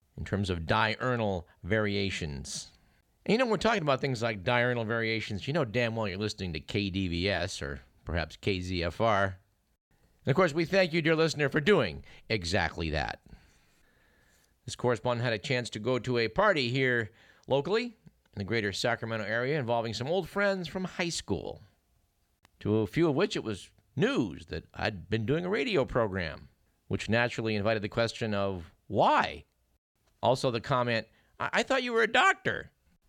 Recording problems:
none

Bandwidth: 17.5 kHz